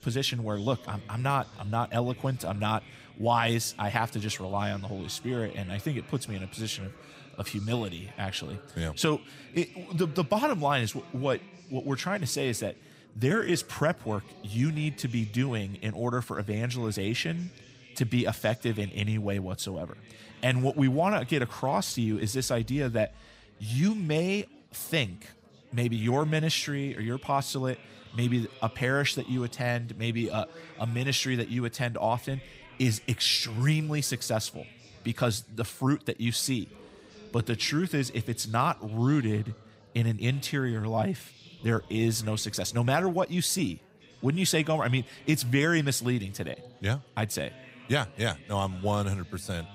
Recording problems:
chatter from many people; faint; throughout; 20 dB below the speech

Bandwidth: 15.5 kHz